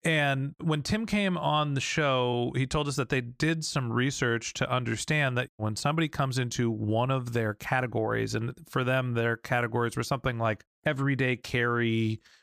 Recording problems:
uneven, jittery; slightly; from 2 to 12 s

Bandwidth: 15 kHz